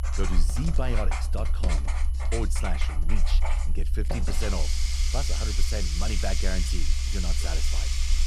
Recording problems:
household noises; very loud; throughout; as loud as the speech
low rumble; noticeable; throughout; 15 dB below the speech
high-pitched whine; faint; until 5.5 s; 11 kHz, 20 dB below the speech

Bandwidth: 15.5 kHz